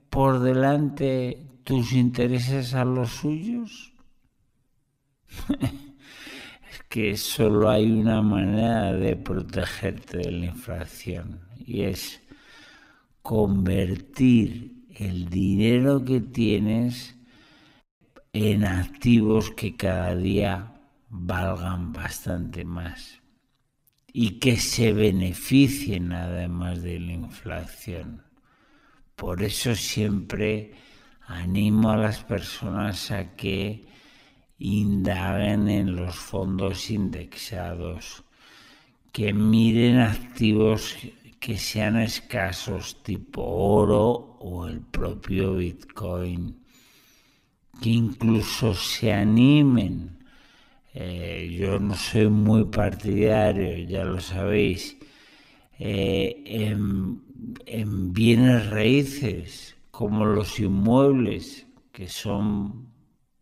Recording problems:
wrong speed, natural pitch; too slow; 0.5 times normal speed

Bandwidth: 15.5 kHz